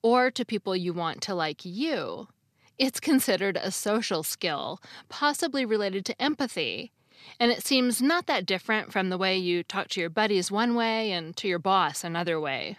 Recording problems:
none

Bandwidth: 14 kHz